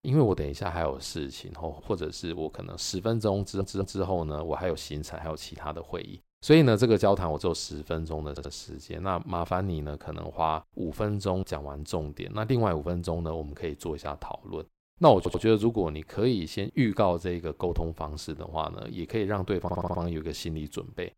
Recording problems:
audio stuttering; 4 times, first at 3.5 s

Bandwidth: 16 kHz